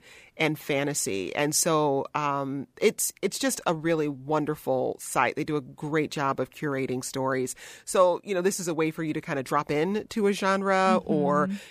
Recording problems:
none

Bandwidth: 15 kHz